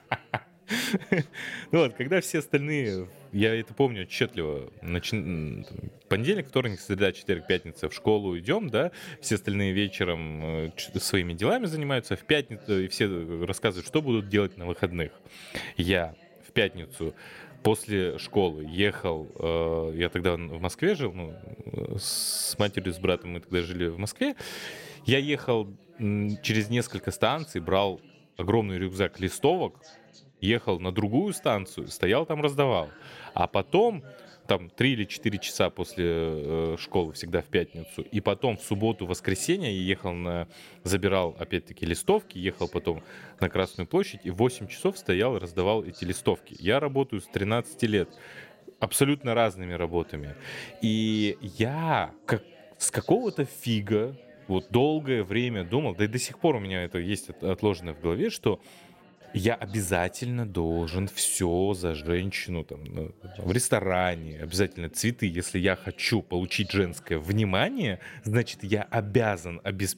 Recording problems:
background chatter; faint; throughout; 4 voices, 25 dB below the speech

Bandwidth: 16 kHz